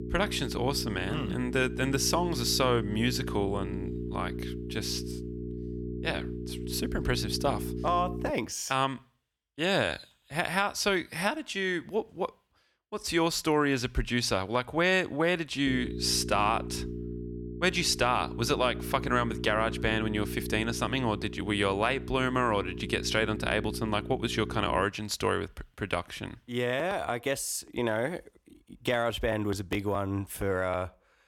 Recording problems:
electrical hum; noticeable; until 8.5 s and from 16 to 25 s; 60 Hz, 15 dB below the speech

